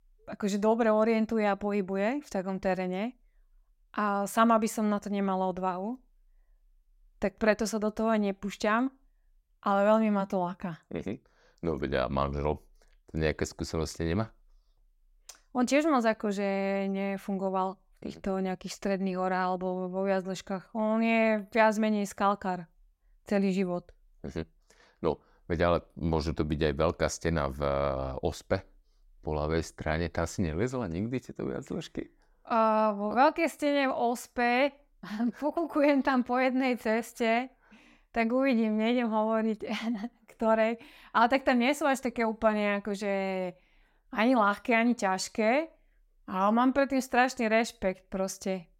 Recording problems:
none

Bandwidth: 16 kHz